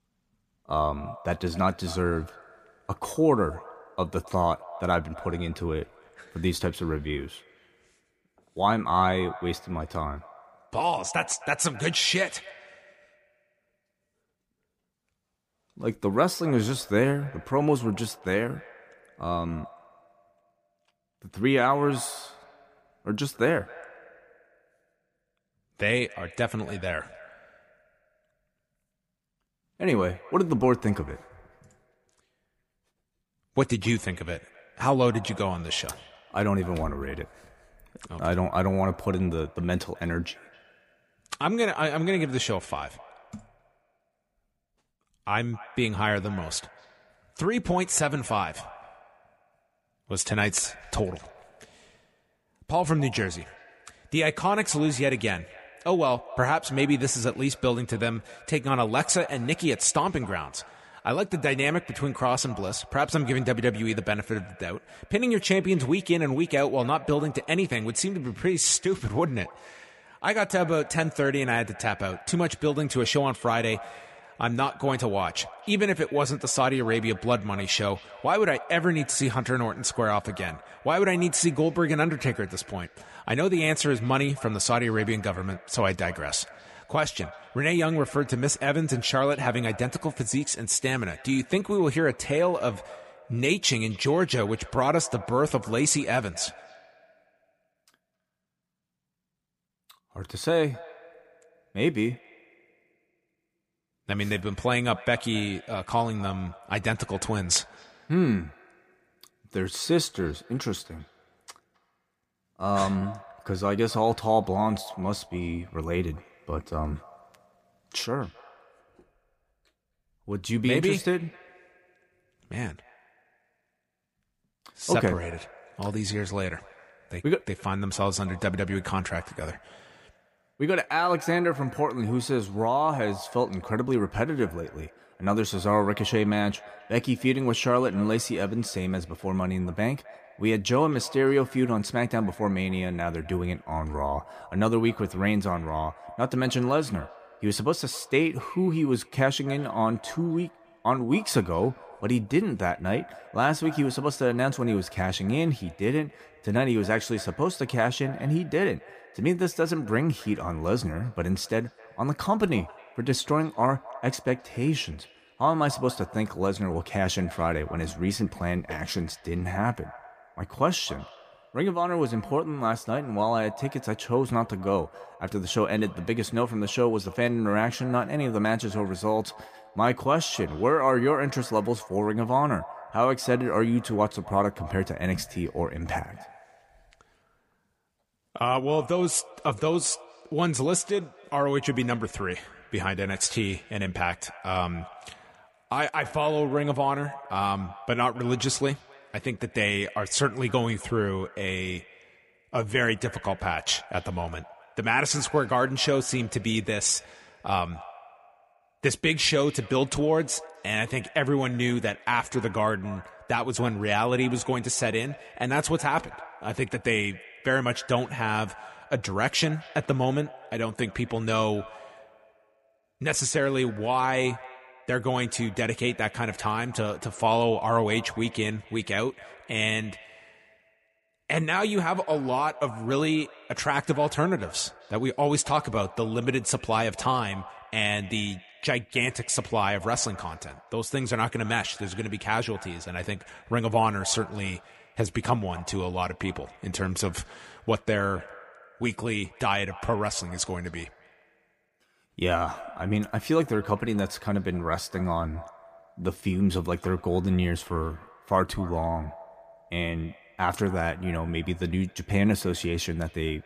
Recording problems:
echo of what is said; faint; throughout; 260 ms later, 20 dB below the speech

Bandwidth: 15 kHz